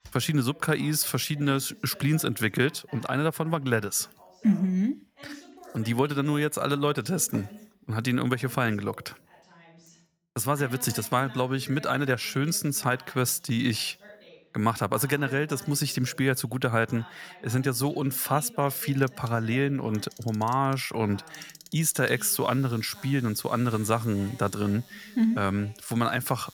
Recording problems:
household noises; faint; from 19 s on; 25 dB below the speech
voice in the background; faint; throughout; 20 dB below the speech

